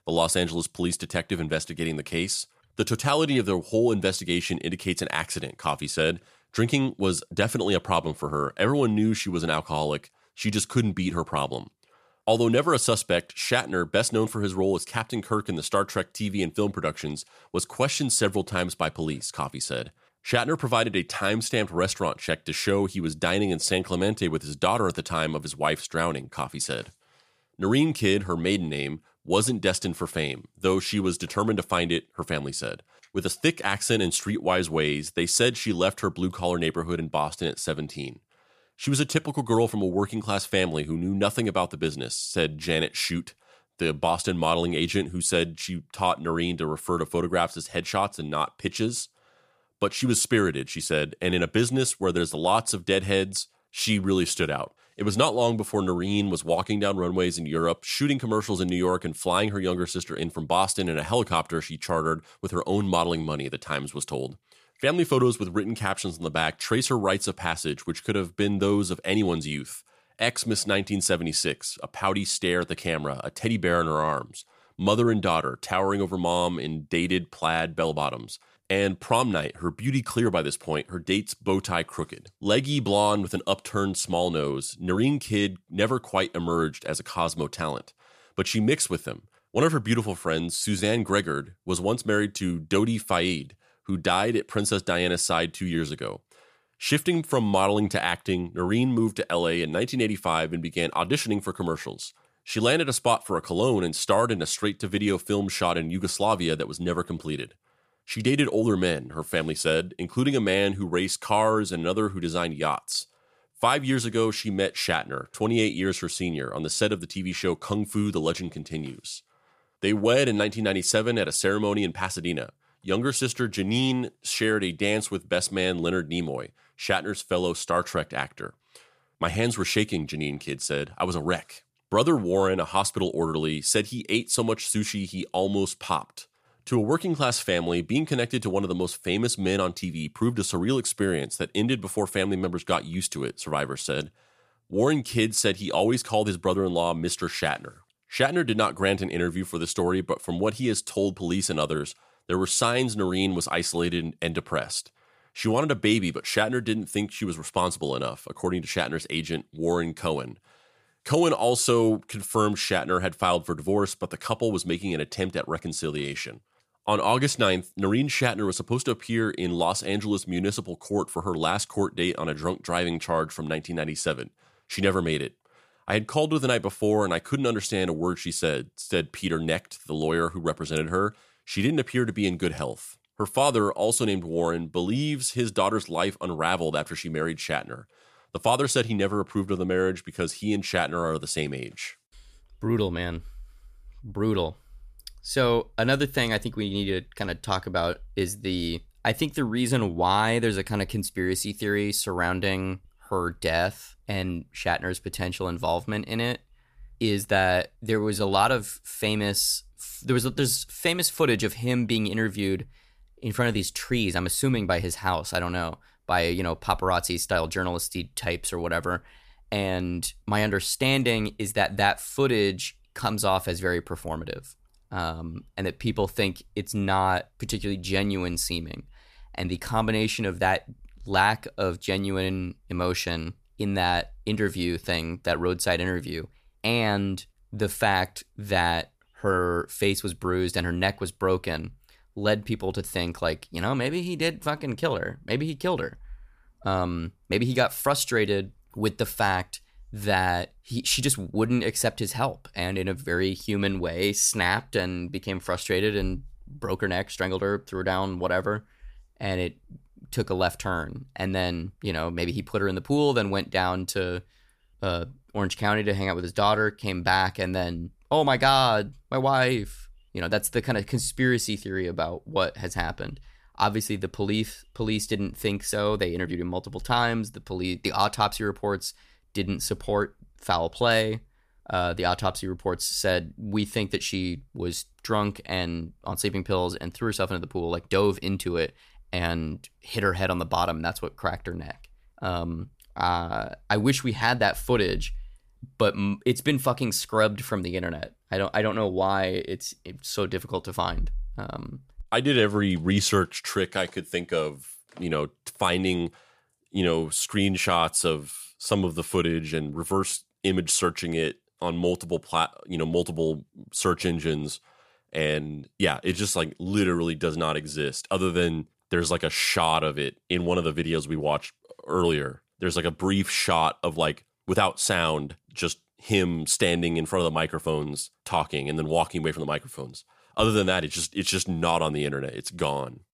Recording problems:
none

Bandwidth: 14.5 kHz